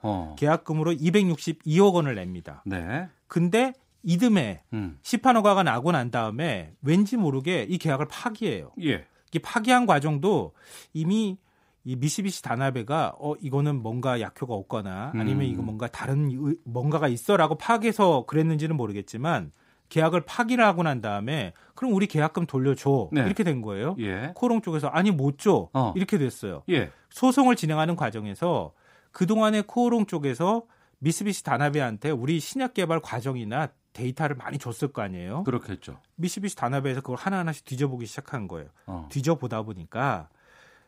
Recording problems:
none

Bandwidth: 15.5 kHz